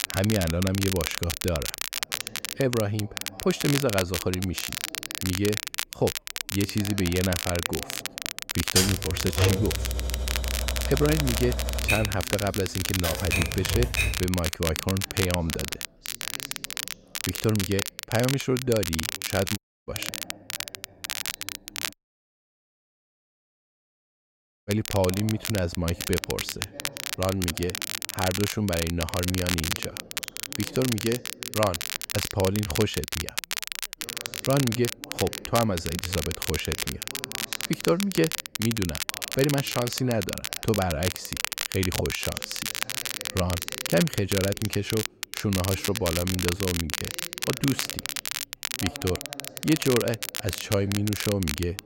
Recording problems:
crackle, like an old record; loud; 3 dB below the speech
background chatter; faint; throughout; 2 voices, 20 dB below the speech
keyboard typing; loud; from 9 to 14 s; peak 5 dB above the speech
audio cutting out; at 20 s and at 22 s for 2.5 s

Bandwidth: 16 kHz